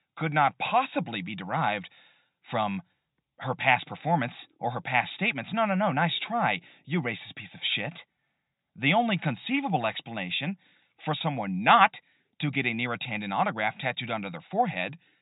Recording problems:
high frequencies cut off; severe; nothing above 4 kHz

